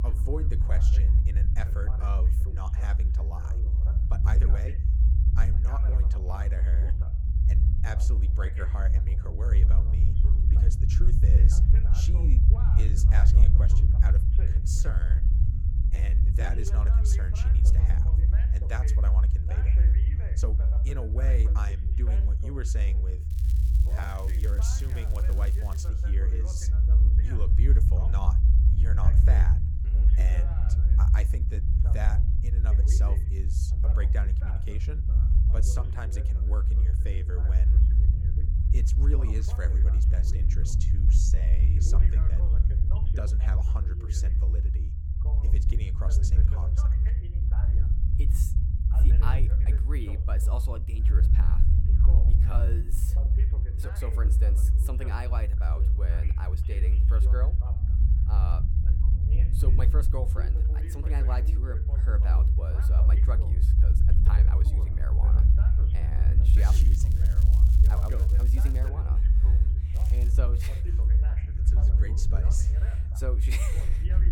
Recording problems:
voice in the background; loud; throughout; 9 dB below the speech
low rumble; loud; throughout; 1 dB below the speech
crackling; noticeable; from 23 to 26 s, from 1:06 to 1:09 and at 1:10; 10 dB below the speech
background music; faint; throughout; 30 dB below the speech
uneven, jittery; strongly; from 4 s to 1:10

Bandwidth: 18.5 kHz